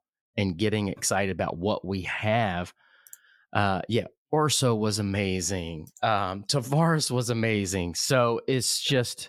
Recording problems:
none

